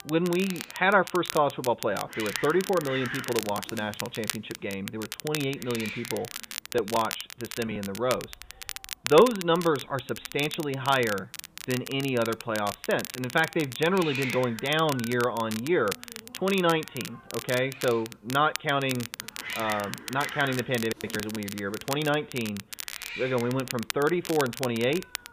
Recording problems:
high frequencies cut off; severe; nothing above 4 kHz
hiss; noticeable; throughout; 10 dB below the speech
crackle, like an old record; noticeable; 10 dB below the speech

